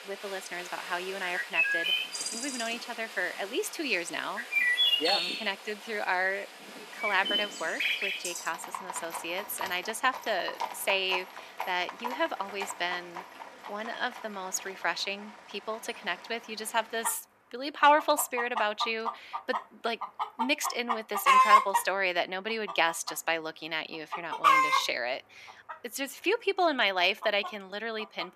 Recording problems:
thin; somewhat; fading below 400 Hz
animal sounds; very loud; throughout; 1 dB above the speech

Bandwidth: 14.5 kHz